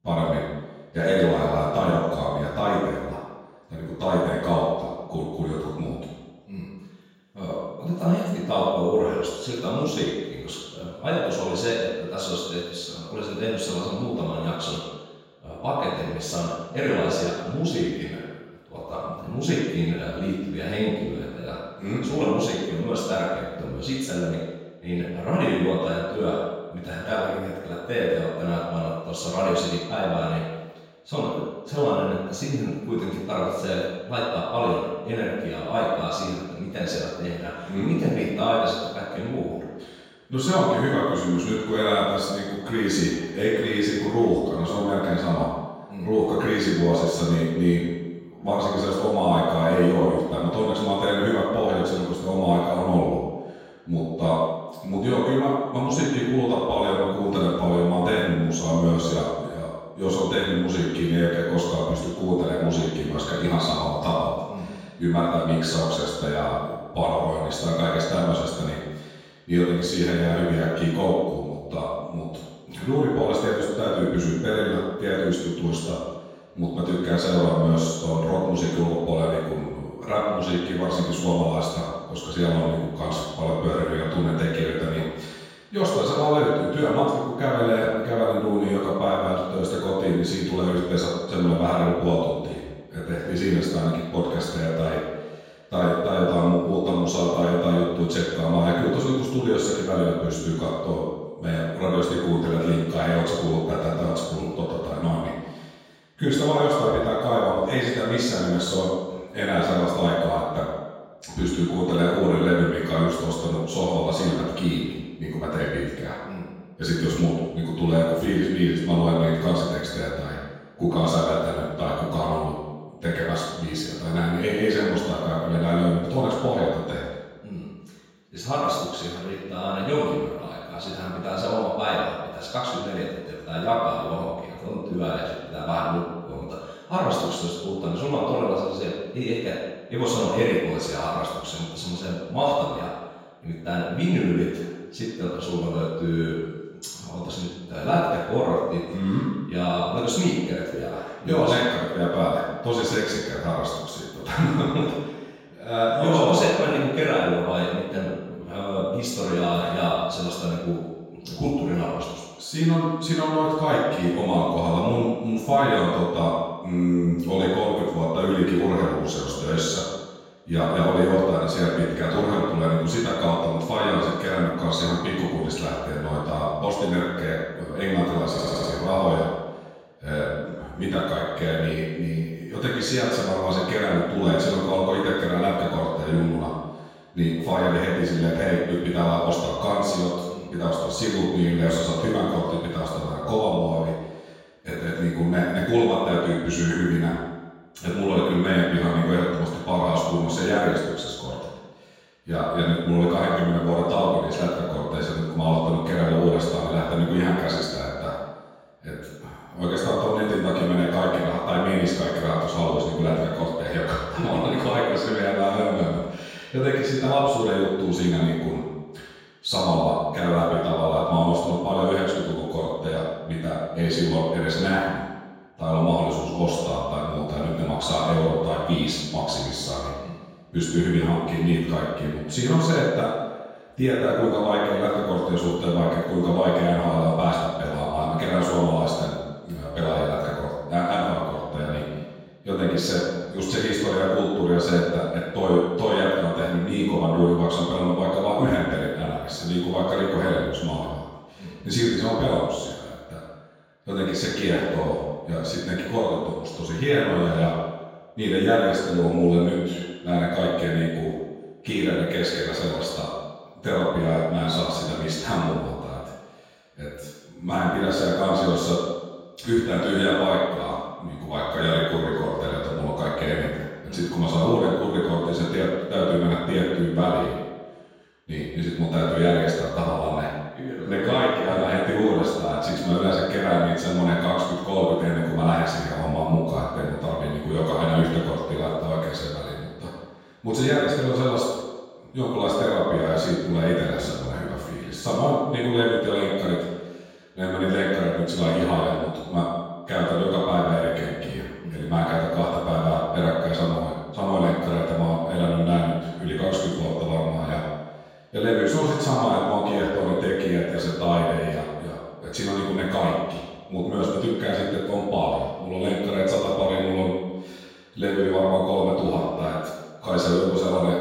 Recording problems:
room echo; strong; dies away in 1.2 s
off-mic speech; far
audio stuttering; at 2:58

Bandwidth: 16 kHz